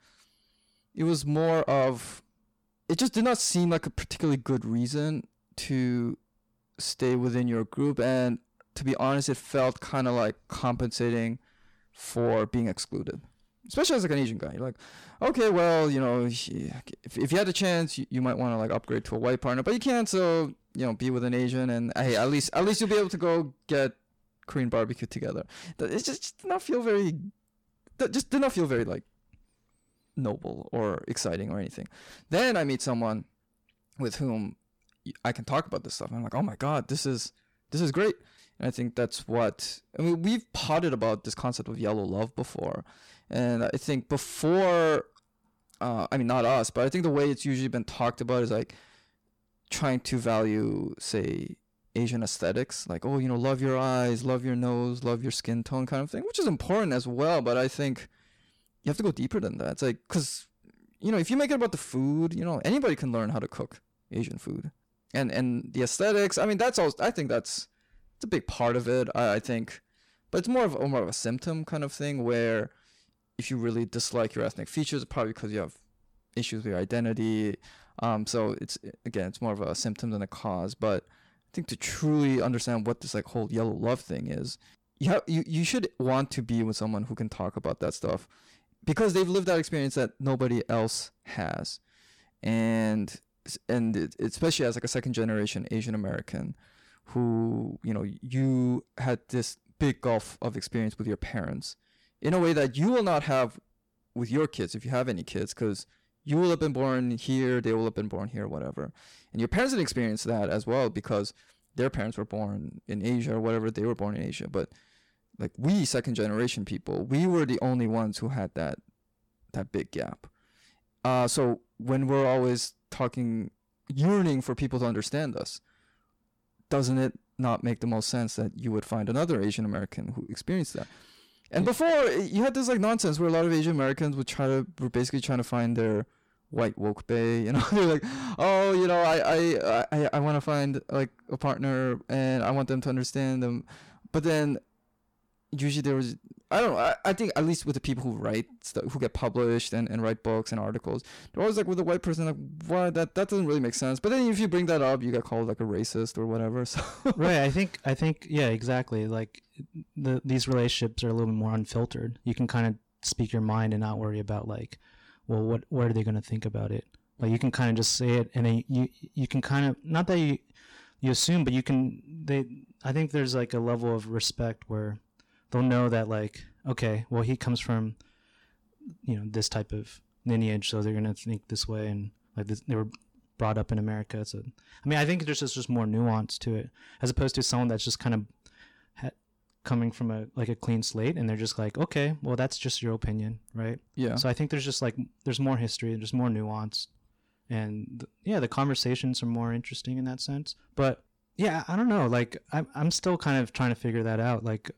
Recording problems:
distortion; slight; 10 dB below the speech

